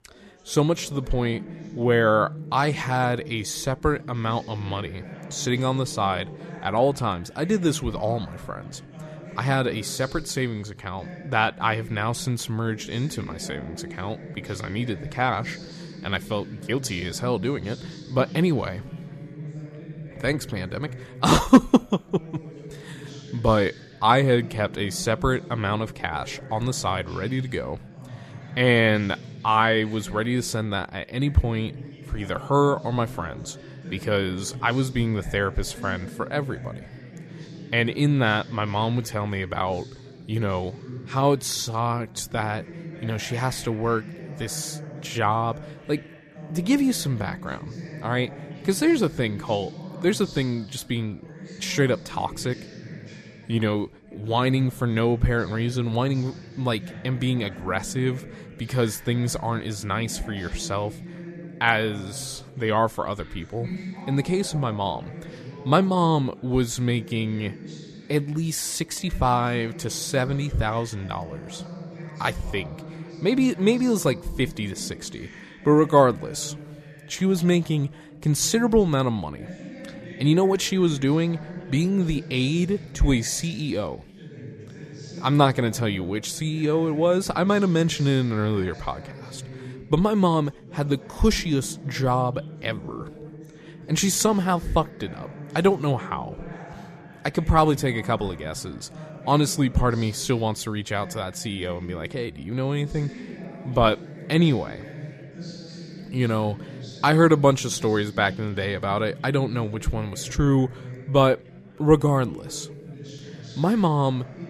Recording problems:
background chatter; noticeable; throughout; 4 voices, 15 dB below the speech

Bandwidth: 14.5 kHz